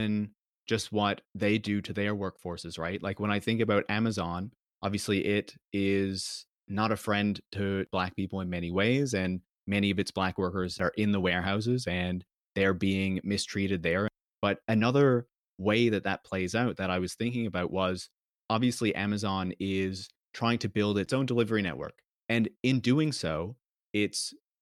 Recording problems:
abrupt cut into speech; at the start

